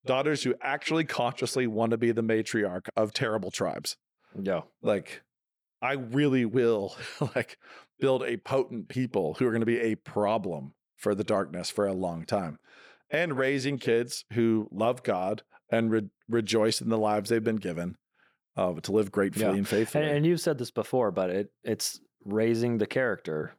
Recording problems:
none

